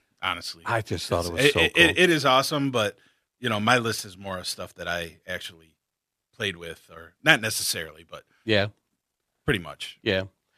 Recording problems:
none

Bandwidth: 14.5 kHz